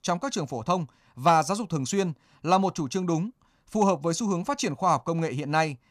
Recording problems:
none

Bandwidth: 14.5 kHz